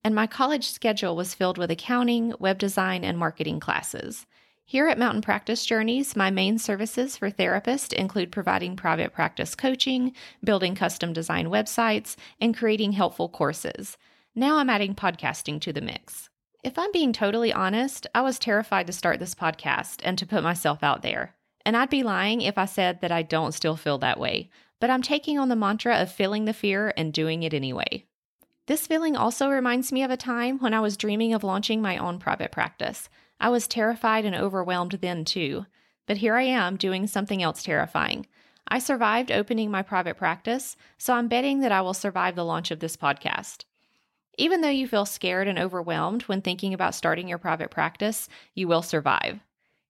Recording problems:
none

